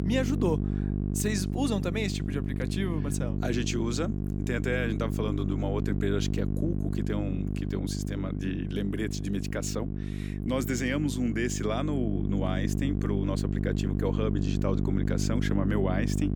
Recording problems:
electrical hum; loud; throughout; 50 Hz, 5 dB below the speech

